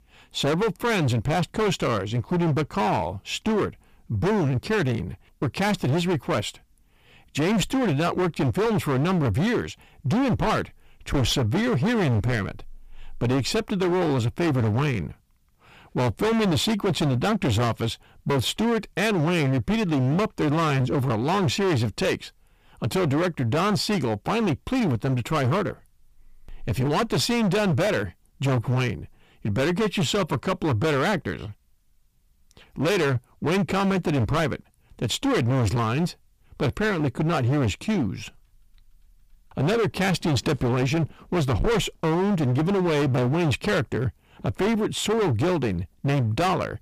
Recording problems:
distortion; heavy; 24% of the sound clipped

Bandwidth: 15 kHz